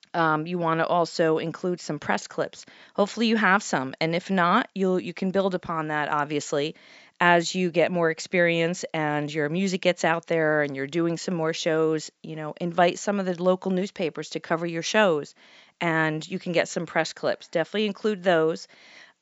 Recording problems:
high frequencies cut off; noticeable; nothing above 8 kHz

